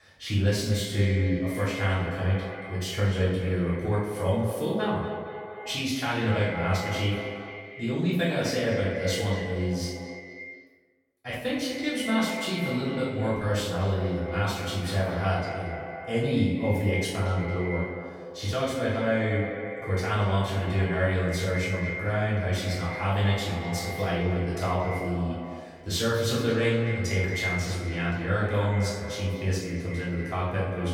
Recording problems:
echo of what is said; strong; throughout; 230 ms later, 8 dB below the speech
off-mic speech; far
room echo; noticeable; dies away in 0.8 s

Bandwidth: 17.5 kHz